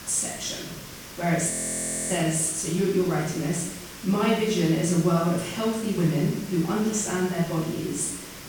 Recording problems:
off-mic speech; far
room echo; noticeable; dies away in 0.7 s
hiss; noticeable; throughout; 15 dB below the speech
audio freezing; at 1.5 s for 0.5 s

